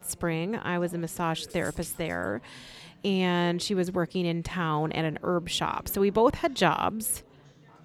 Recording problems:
chatter from many people; faint; throughout; 25 dB below the speech

